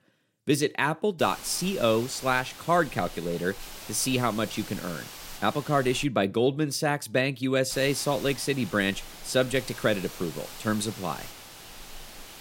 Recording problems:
hiss; noticeable; from 1 to 6 s and from 7.5 s on; 15 dB below the speech

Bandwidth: 16 kHz